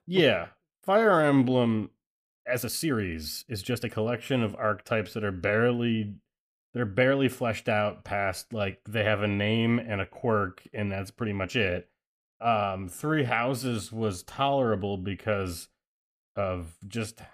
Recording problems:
uneven, jittery; strongly; from 0.5 to 13 s

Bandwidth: 14.5 kHz